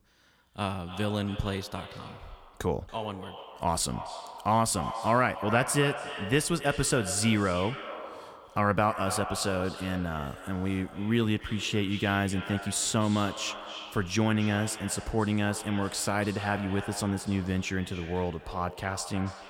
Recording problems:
echo of what is said; strong; throughout; 280 ms later, 10 dB below the speech

